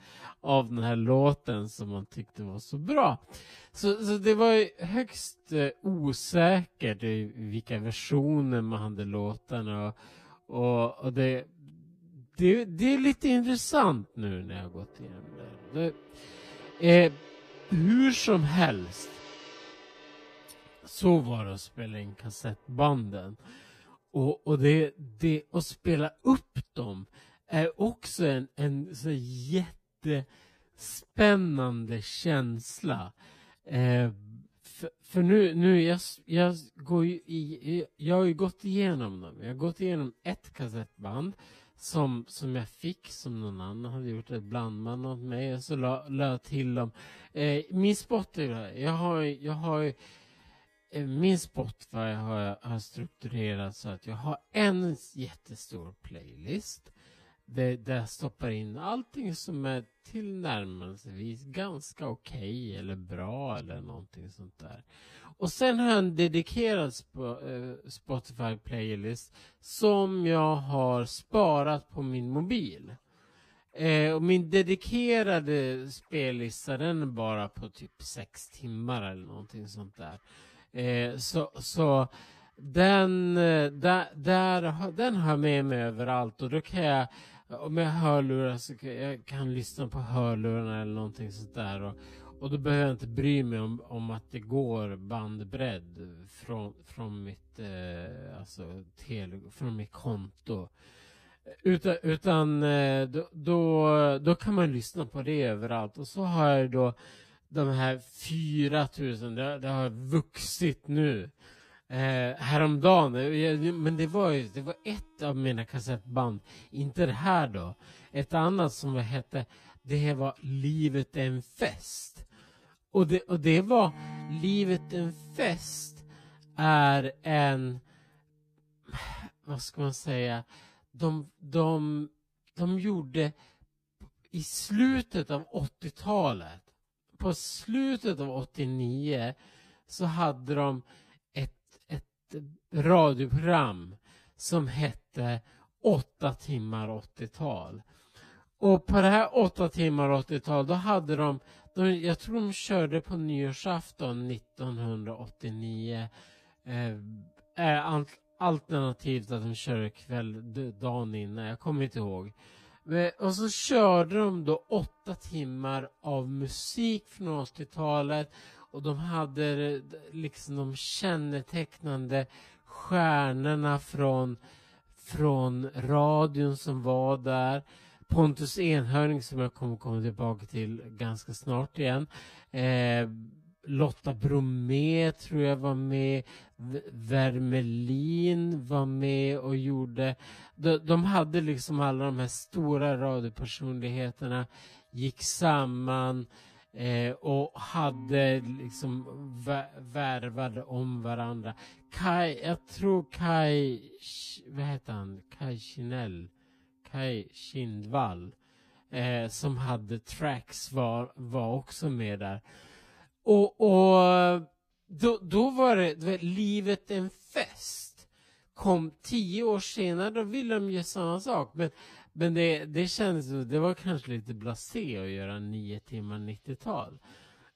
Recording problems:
wrong speed, natural pitch; too slow; 0.6 times normal speed
background music; faint; throughout; 25 dB below the speech

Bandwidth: 14.5 kHz